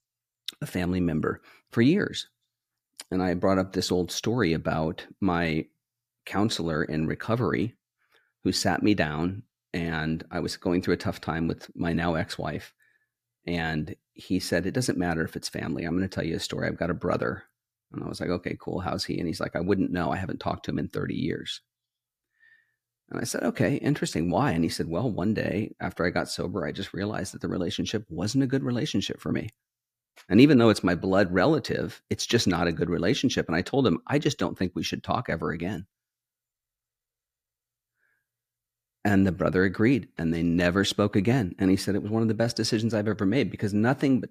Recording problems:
none

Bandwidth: 14.5 kHz